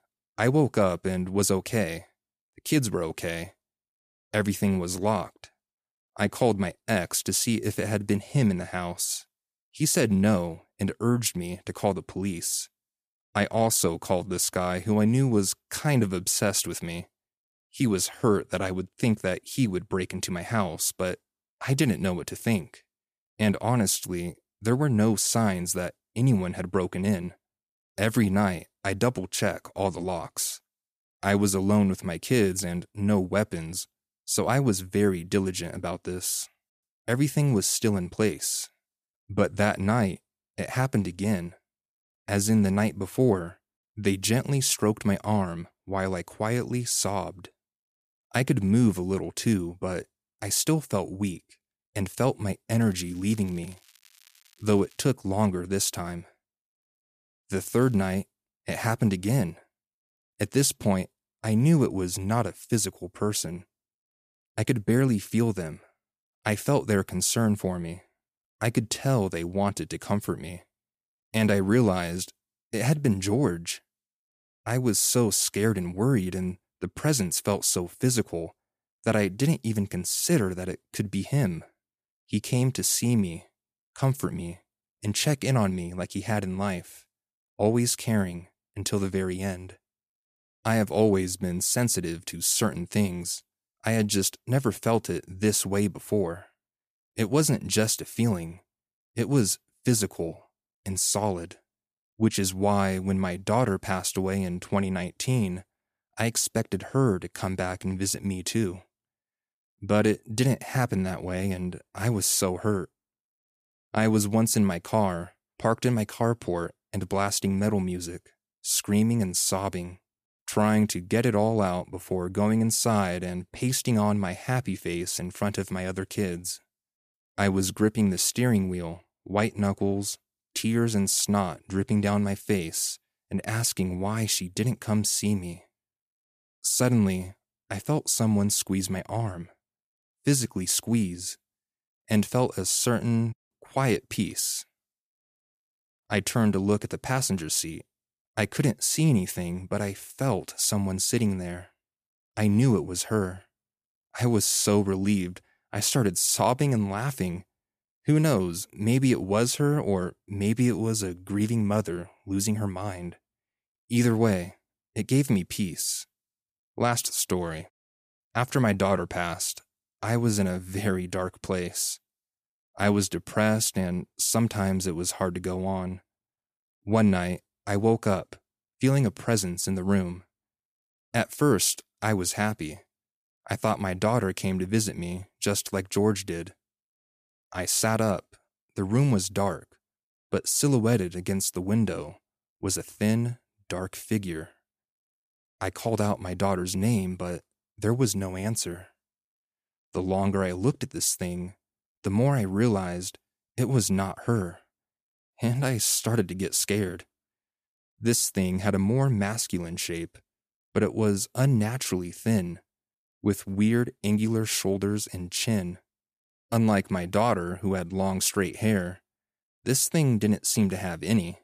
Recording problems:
crackling; faint; from 53 to 55 s and at 58 s; 30 dB below the speech

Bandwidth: 14.5 kHz